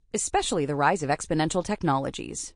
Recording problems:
garbled, watery; slightly; nothing above 9.5 kHz

